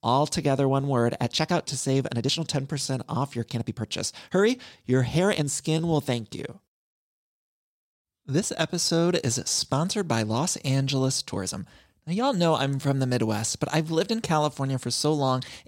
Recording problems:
uneven, jittery; strongly; from 1.5 to 14 s

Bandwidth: 16 kHz